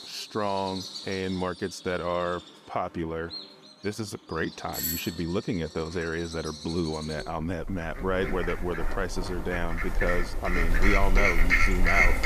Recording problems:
animal sounds; very loud; throughout; 2 dB above the speech
doorbell; loud; at 4.5 s; peak 2 dB above the speech
phone ringing; noticeable; from 10 s on; peak 3 dB below the speech

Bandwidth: 14.5 kHz